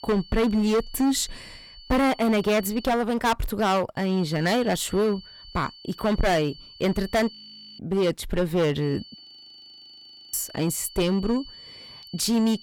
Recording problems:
distortion; heavy; 13% of the sound clipped
high-pitched whine; noticeable; until 3 s, from 4 to 7.5 s and from 9 s on; 4.5 kHz, 20 dB below the speech
audio freezing; at 7.5 s and at 9 s for 1 s

